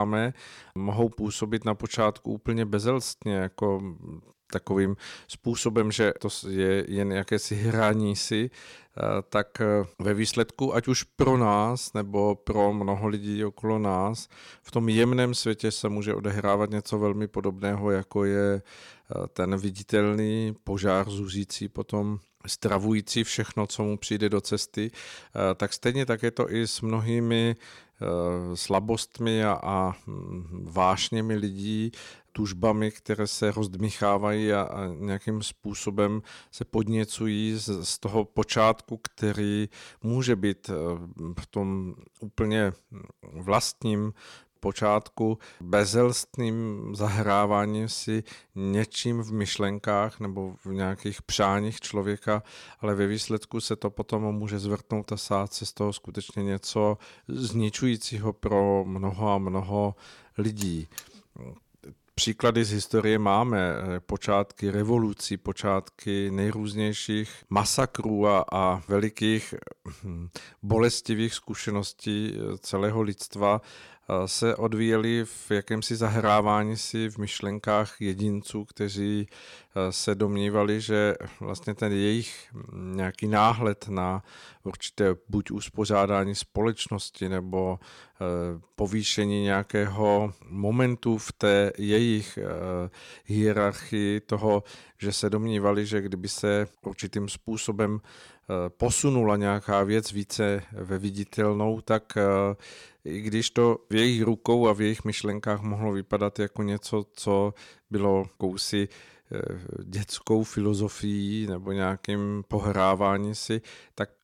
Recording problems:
abrupt cut into speech; at the start
alarm; faint; at 1:01; peak 15 dB below the speech

